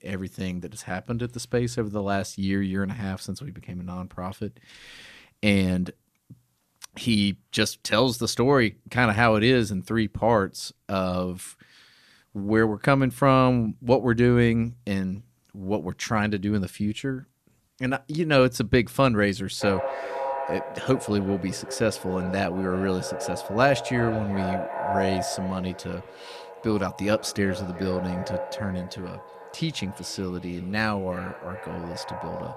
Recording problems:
echo of what is said; strong; from 20 s on; 370 ms later, 9 dB below the speech

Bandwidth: 14.5 kHz